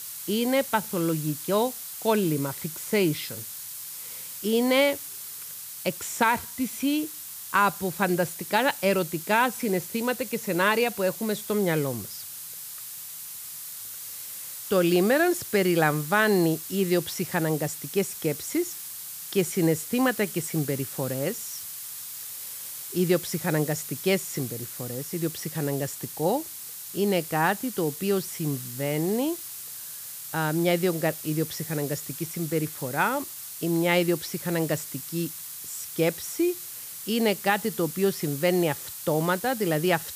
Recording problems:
hiss; loud; throughout; 9 dB below the speech

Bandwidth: 15 kHz